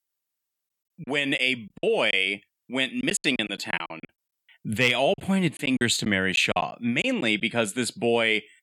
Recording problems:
choppy; very; from 1 to 2 s, from 3 to 4 s and from 5 to 7.5 s; 13% of the speech affected

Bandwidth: 17.5 kHz